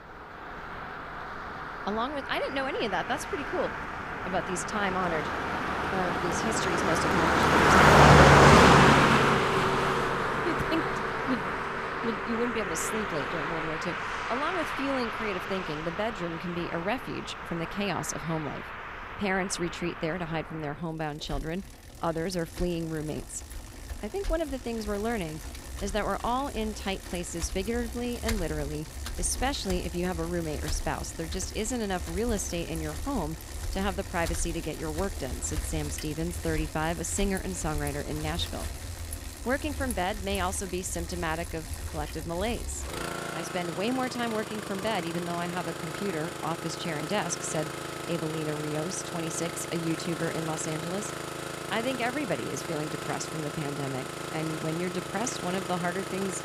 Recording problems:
traffic noise; very loud; throughout; 4 dB above the speech
chatter from many people; faint; throughout; 25 dB below the speech

